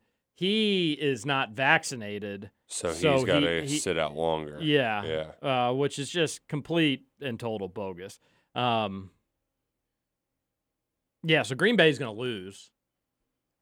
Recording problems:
none

